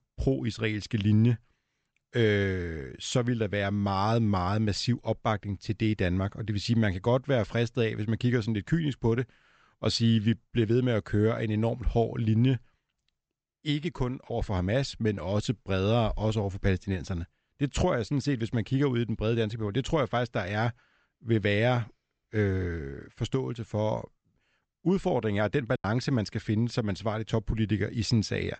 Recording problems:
high frequencies cut off; noticeable; nothing above 8 kHz
choppy; occasionally; at 26 s; 5% of the speech affected

